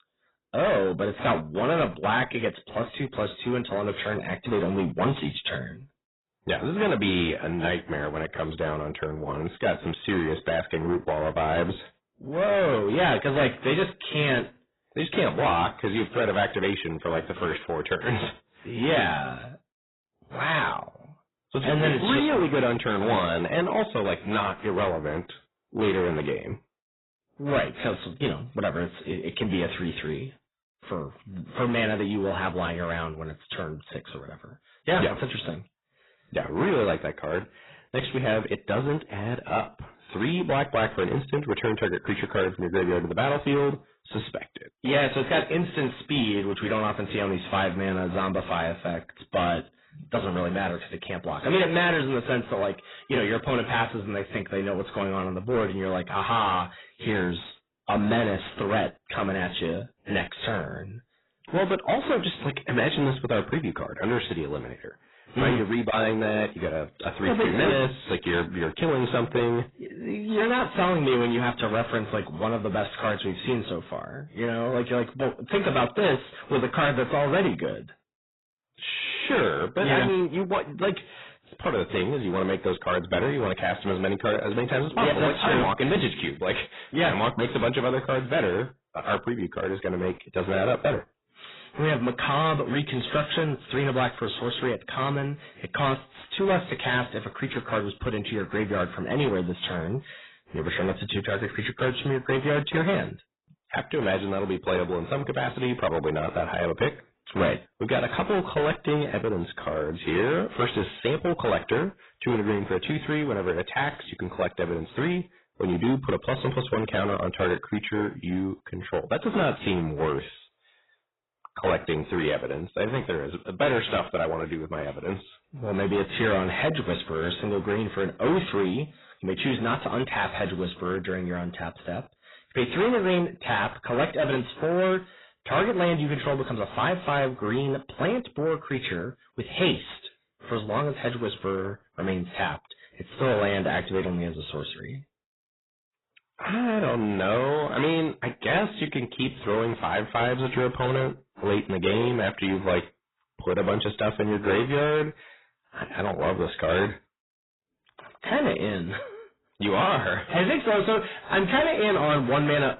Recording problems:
distortion; heavy; 7 dB below the speech
garbled, watery; badly; nothing above 4 kHz

